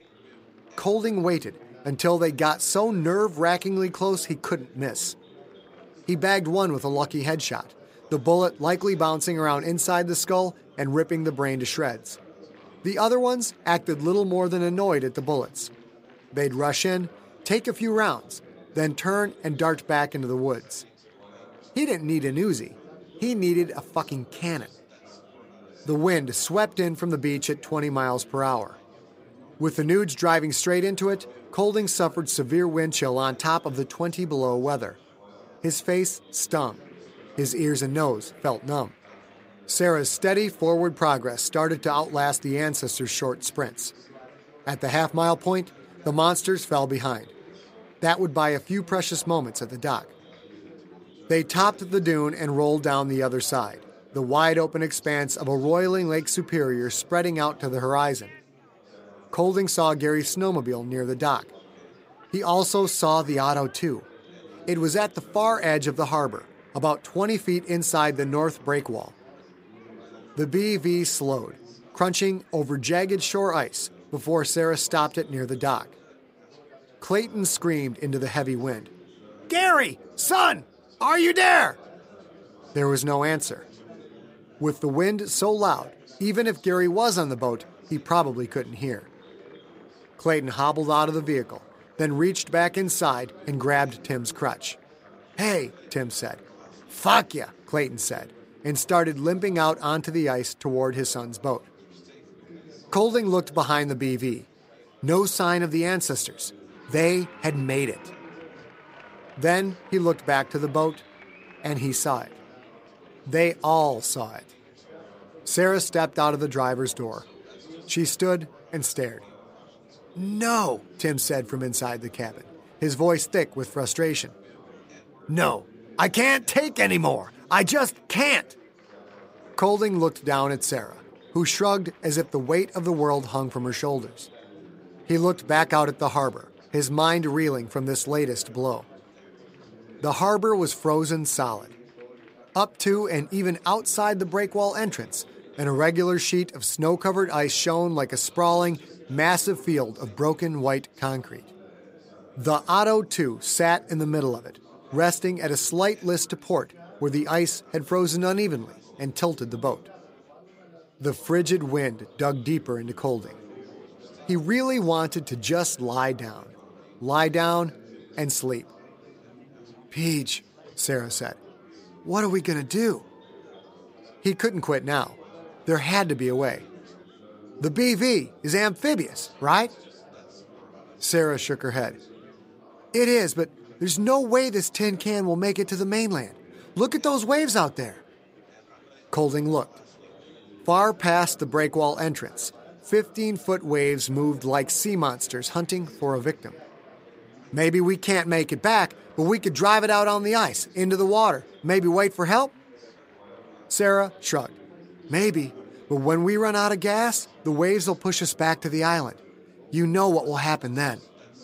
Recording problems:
chatter from many people; faint; throughout; 25 dB below the speech

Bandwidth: 15.5 kHz